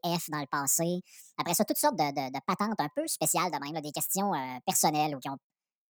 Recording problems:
wrong speed and pitch; too fast and too high; 1.5 times normal speed

